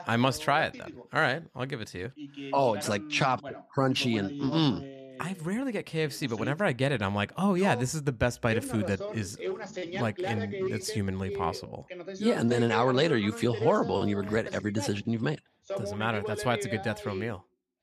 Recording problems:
voice in the background; loud; throughout; 9 dB below the speech

